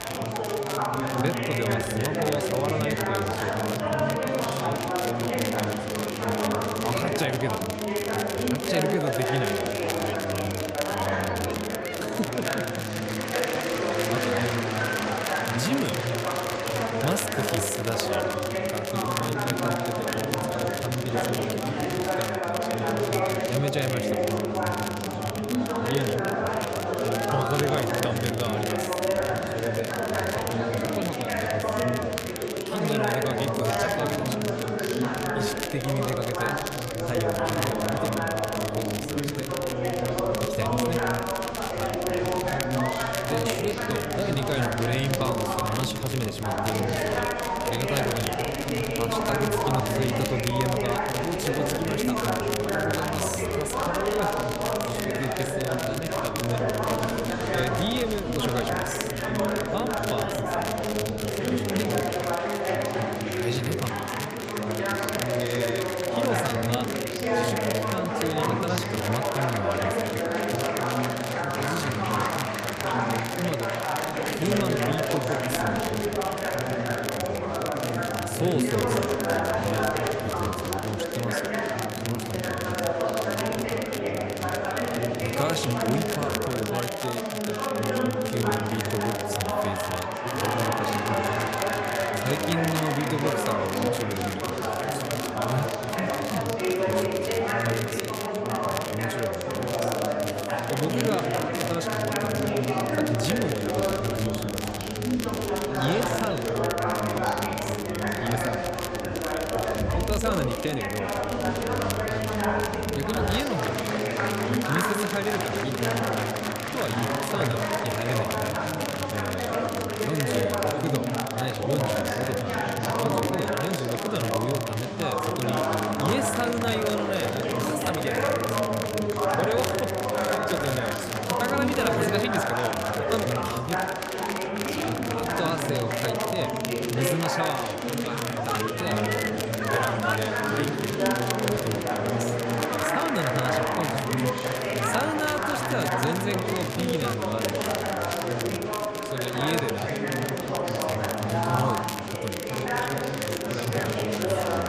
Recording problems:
murmuring crowd; very loud; throughout; 5 dB above the speech
crackle, like an old record; loud; 4 dB below the speech

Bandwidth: 14.5 kHz